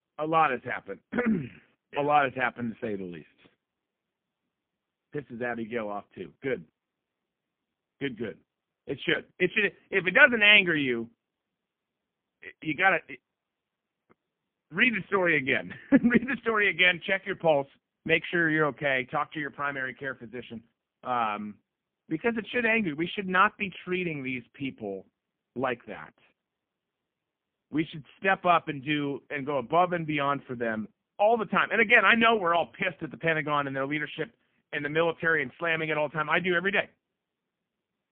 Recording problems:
phone-call audio; poor line; nothing above 3.5 kHz

